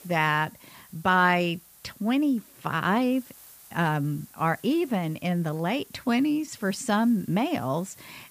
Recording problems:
hiss; faint; throughout; 25 dB below the speech

